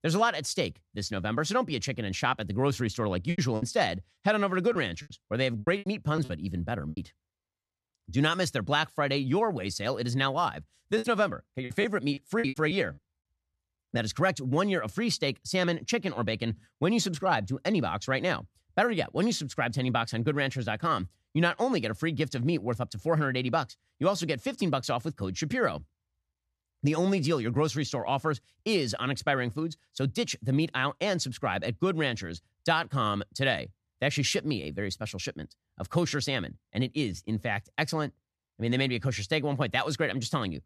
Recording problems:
choppy; very; from 3.5 to 7 s and from 11 to 14 s; 14% of the speech affected

